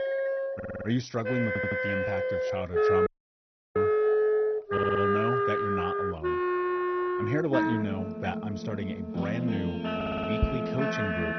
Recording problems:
garbled, watery; badly; nothing above 6 kHz
background music; very loud; throughout; 5 dB above the speech
audio stuttering; 4 times, first at 0.5 s
audio cutting out; at 3 s for 0.5 s

